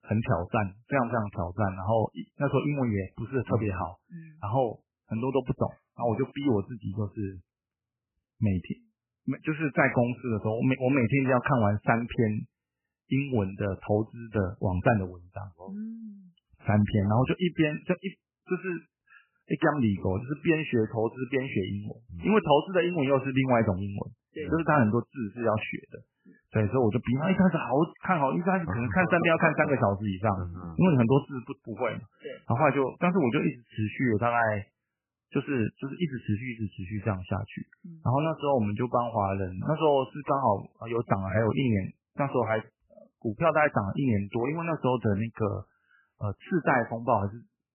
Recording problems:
garbled, watery; badly; nothing above 3 kHz

